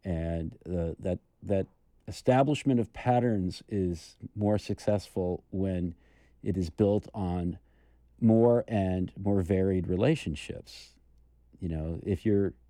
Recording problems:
none

